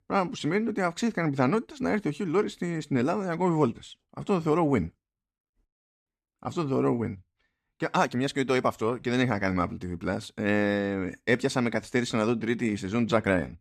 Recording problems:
none

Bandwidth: 14.5 kHz